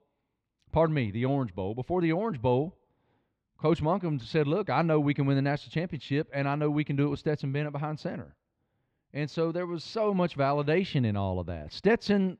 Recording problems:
muffled; very slightly; fading above 3 kHz

